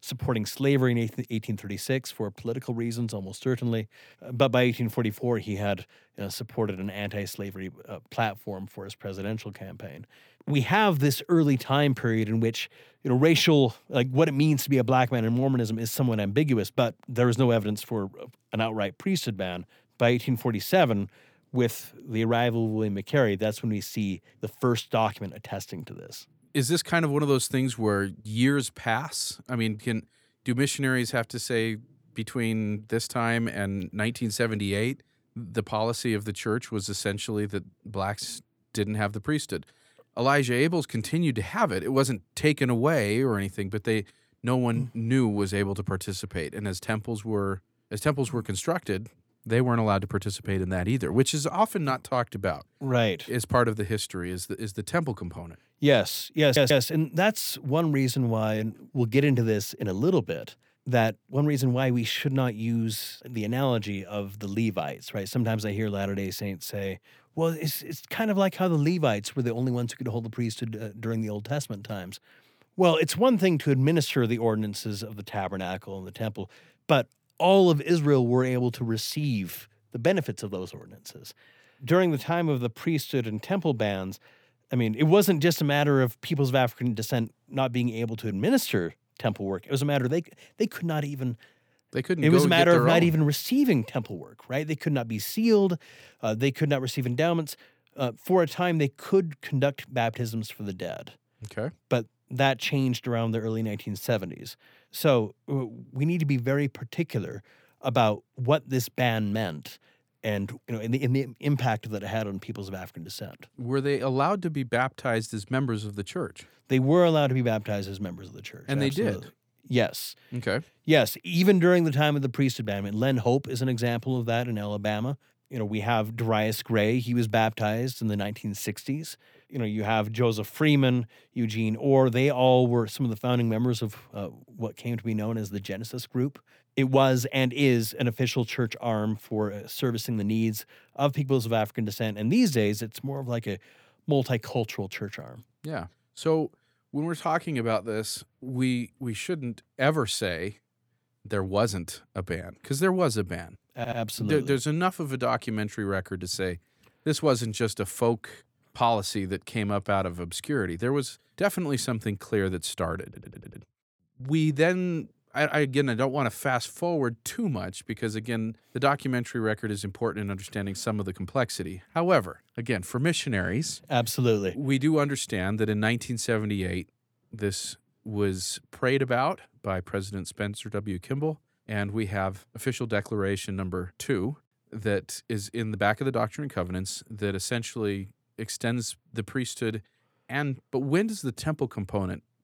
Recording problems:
audio stuttering; at 56 s, at 2:34 and at 2:43

